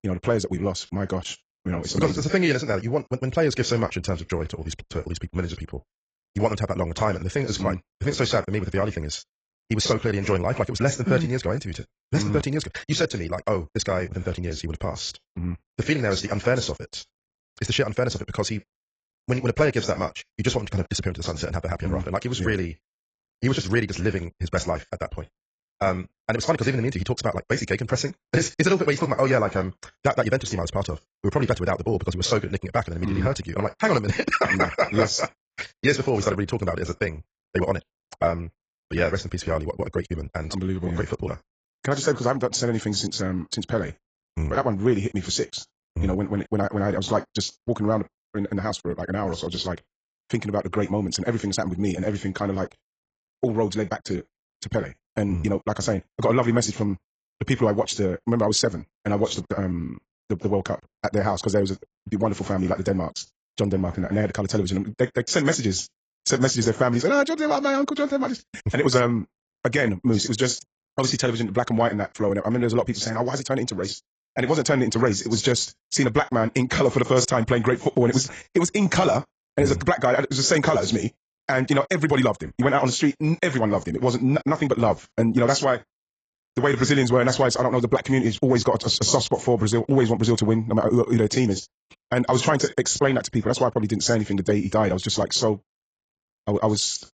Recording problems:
garbled, watery; badly; nothing above 7.5 kHz
wrong speed, natural pitch; too fast; 1.6 times normal speed

